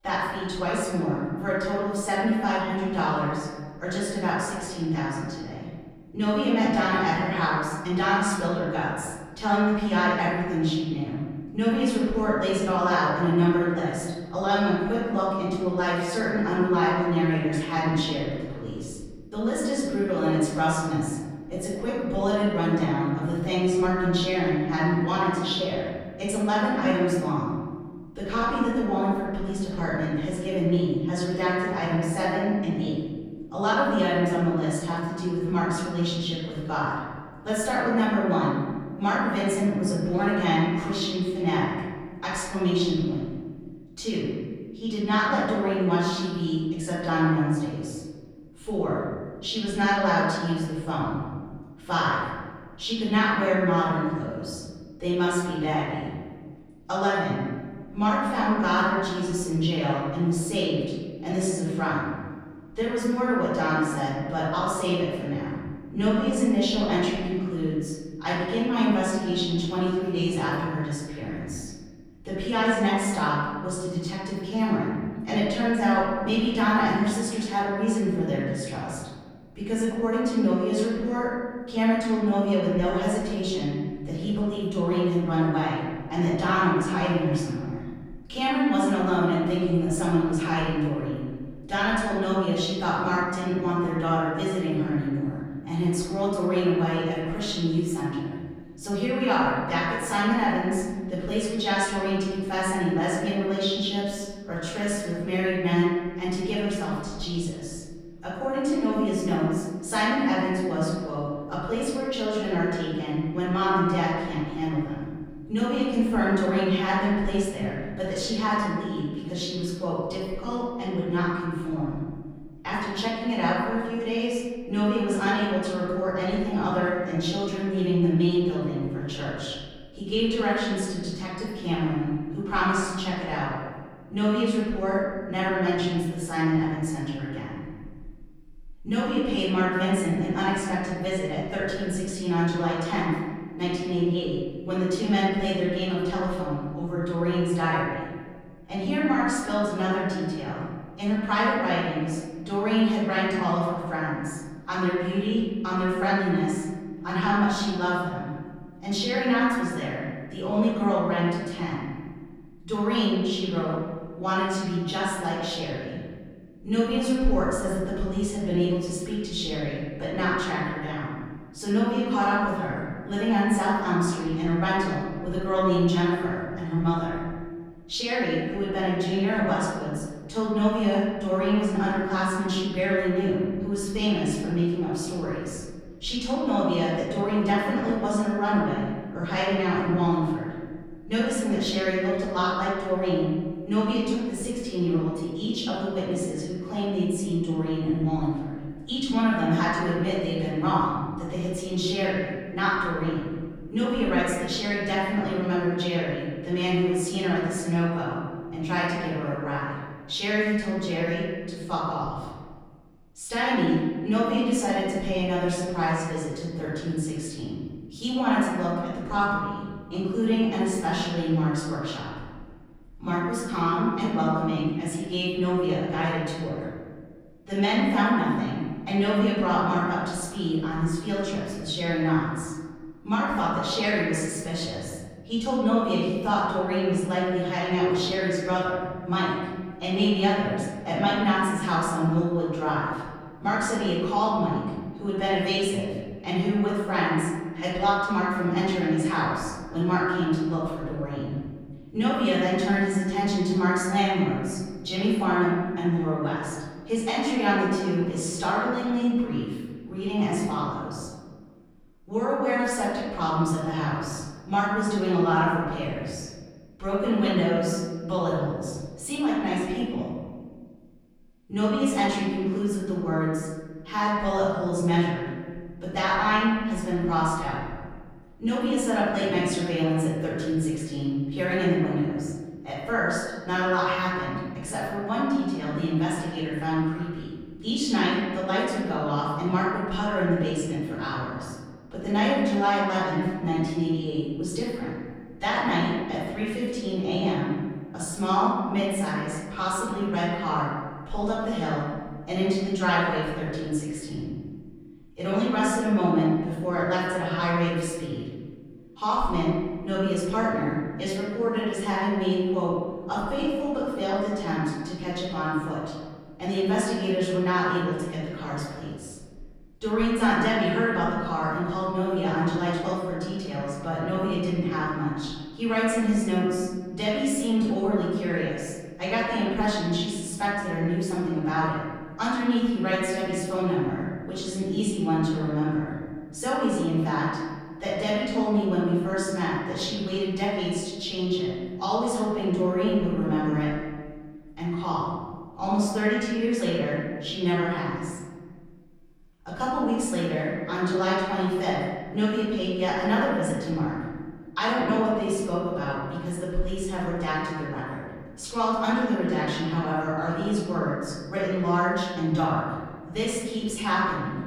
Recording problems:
room echo; strong; dies away in 1.6 s
off-mic speech; far

